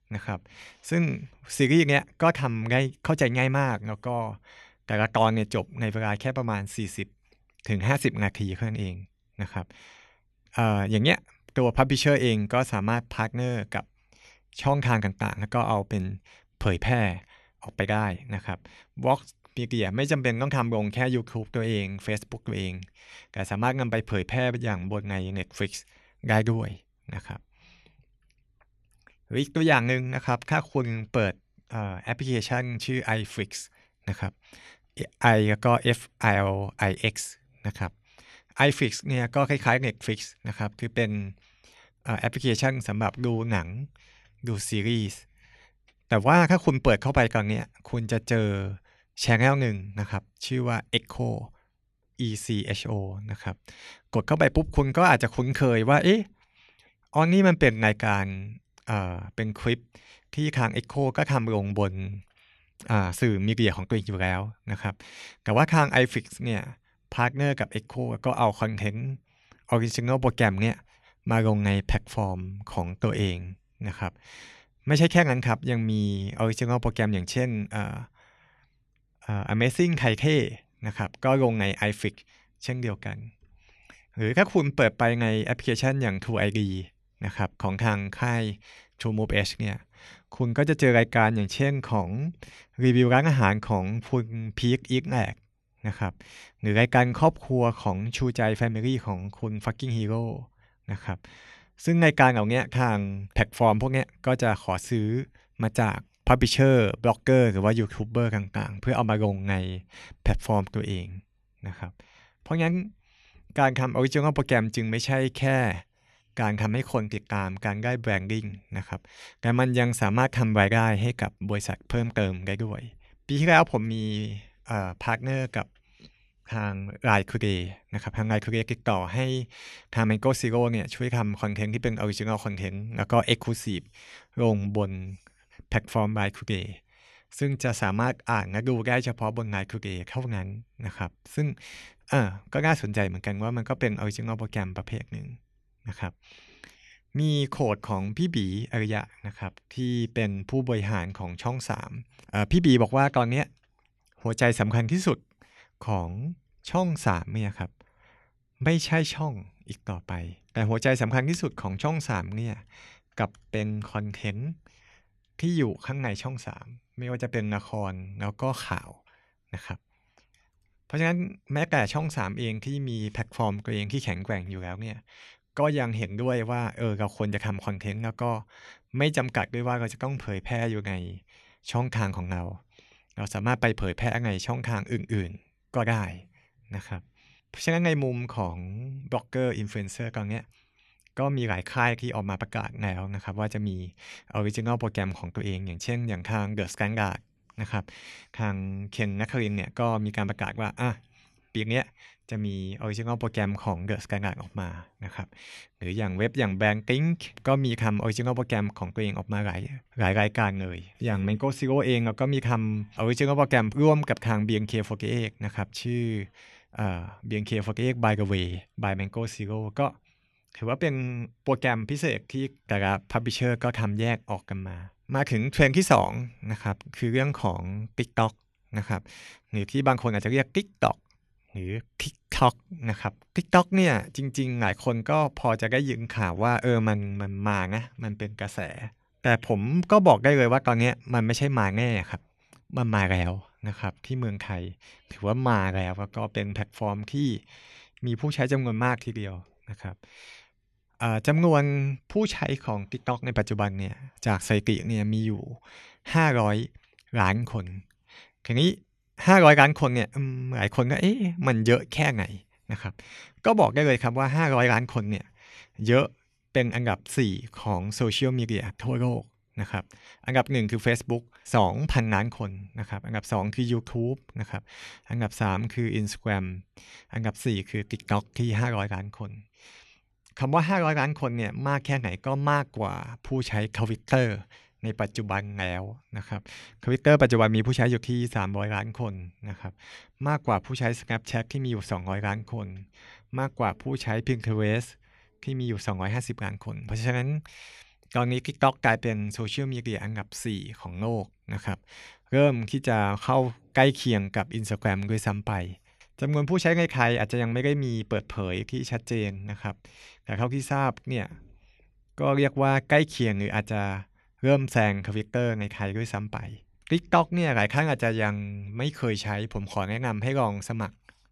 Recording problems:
none

